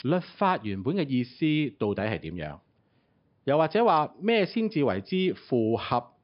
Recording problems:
high frequencies cut off; noticeable; nothing above 5.5 kHz
household noises; faint; throughout; 30 dB below the speech

